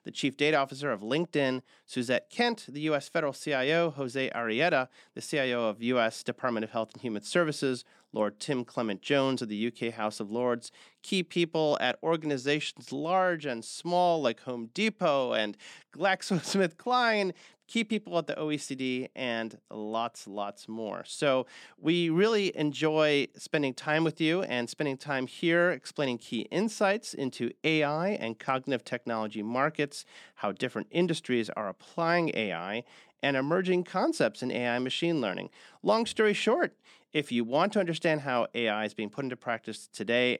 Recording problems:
none

